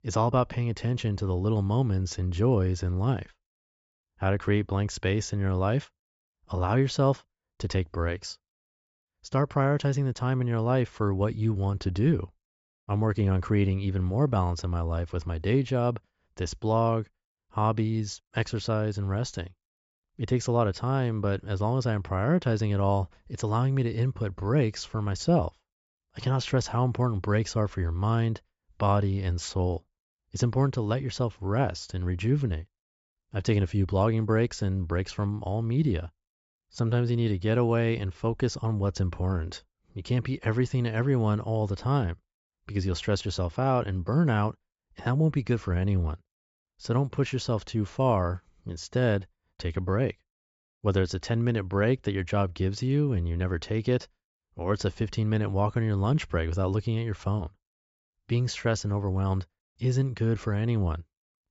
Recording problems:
high frequencies cut off; noticeable; nothing above 7.5 kHz

